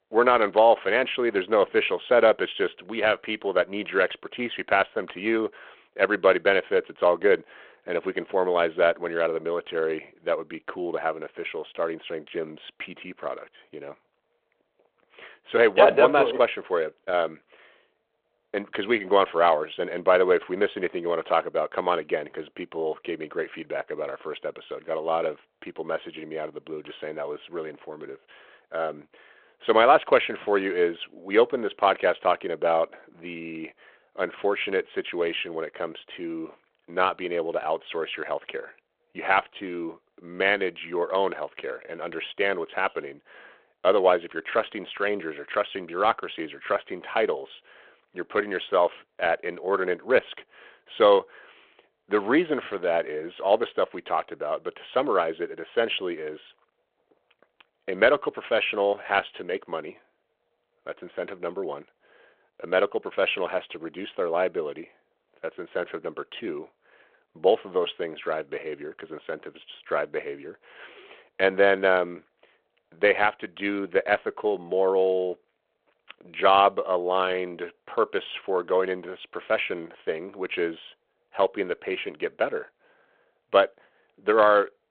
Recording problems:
phone-call audio

